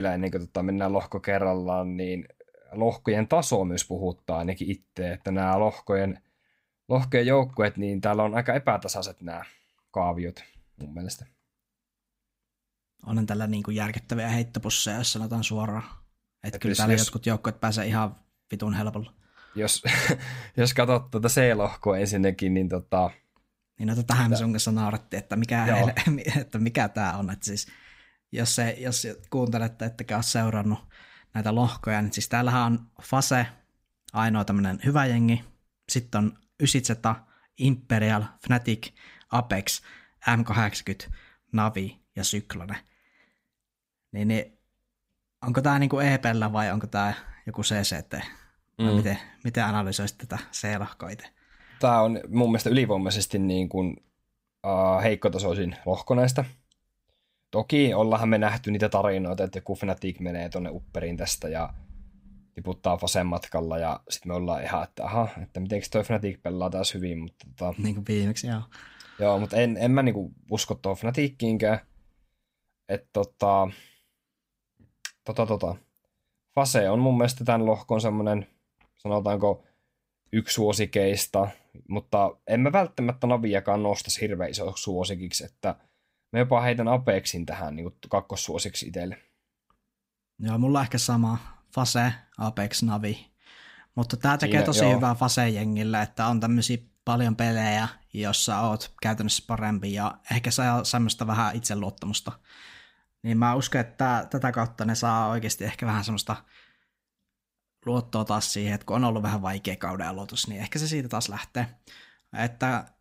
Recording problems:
abrupt cut into speech; at the start

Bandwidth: 15.5 kHz